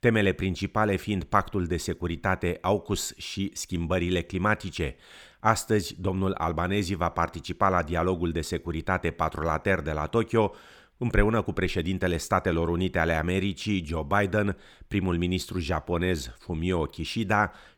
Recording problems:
none

